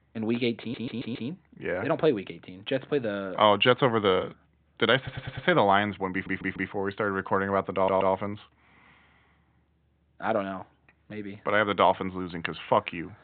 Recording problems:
high frequencies cut off; severe; nothing above 4 kHz
audio stuttering; 4 times, first at 0.5 s

